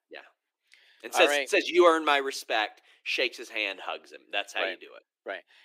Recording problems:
thin; somewhat; fading below 300 Hz

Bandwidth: 15.5 kHz